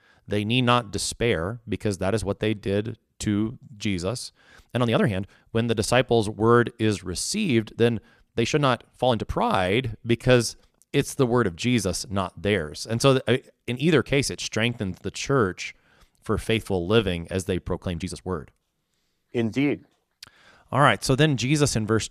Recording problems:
uneven, jittery; strongly; from 2.5 to 18 s

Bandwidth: 14.5 kHz